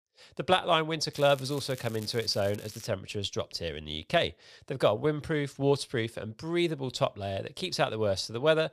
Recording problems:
crackling; noticeable; from 1 to 3 s; 20 dB below the speech

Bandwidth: 14.5 kHz